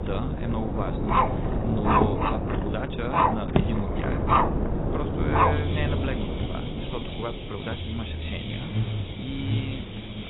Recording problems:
garbled, watery; badly; nothing above 4 kHz
animal sounds; very loud; throughout; 7 dB above the speech
traffic noise; very loud; throughout; 1 dB above the speech
wind noise on the microphone; heavy; 1 dB below the speech

